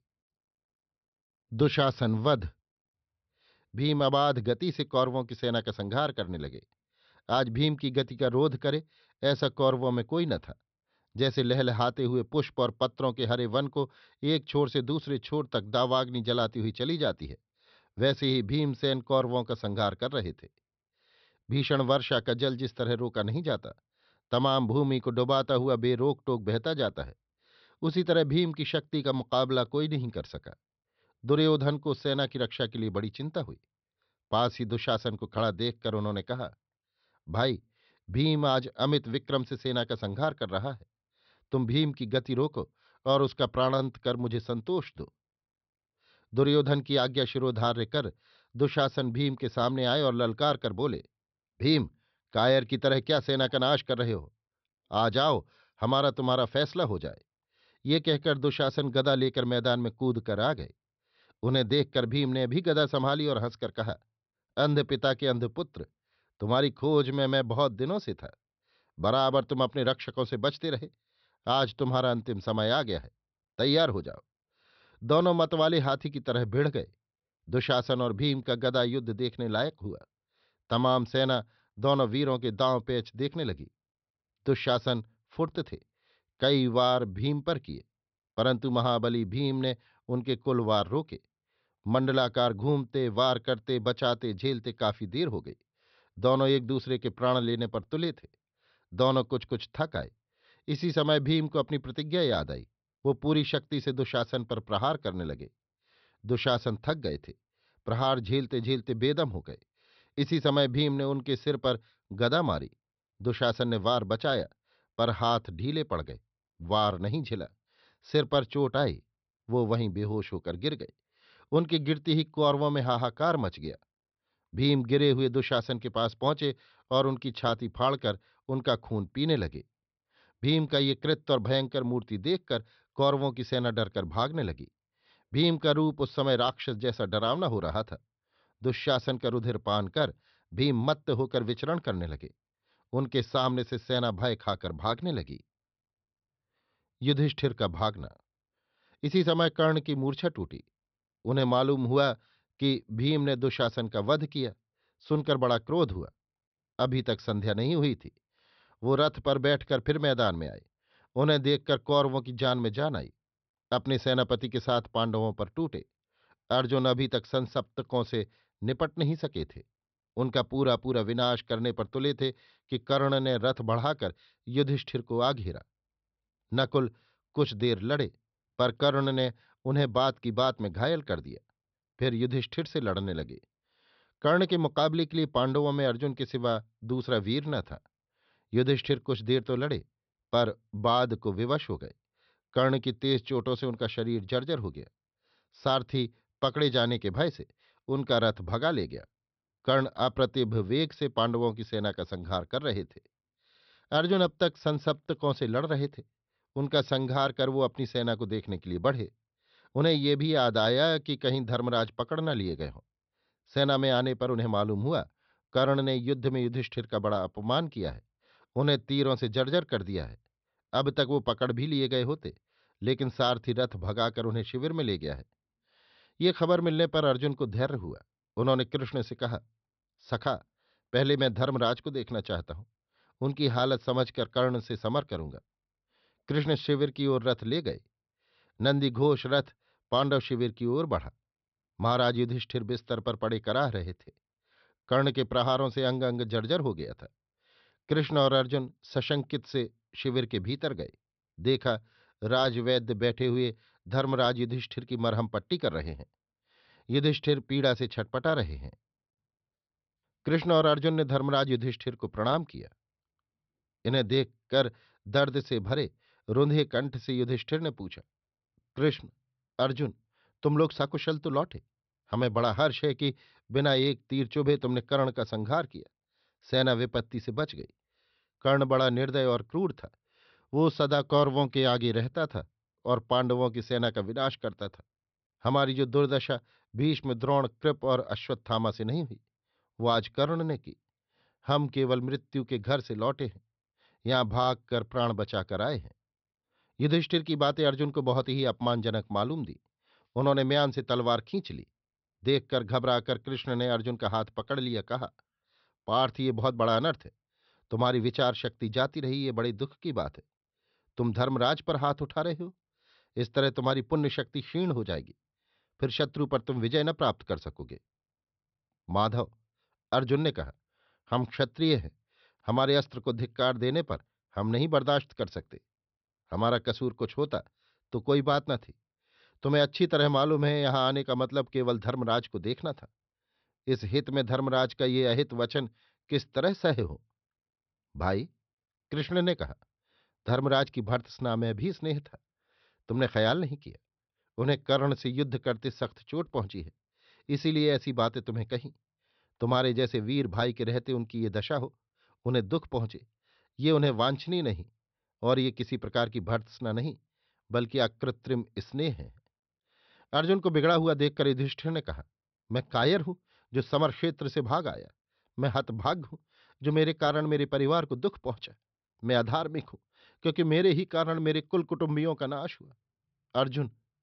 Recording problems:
high frequencies cut off; noticeable; nothing above 5.5 kHz

